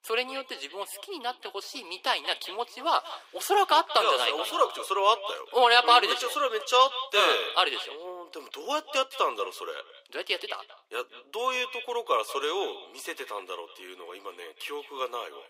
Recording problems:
thin; very; fading below 350 Hz
echo of what is said; noticeable; throughout; 180 ms later, 15 dB below the speech

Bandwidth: 15.5 kHz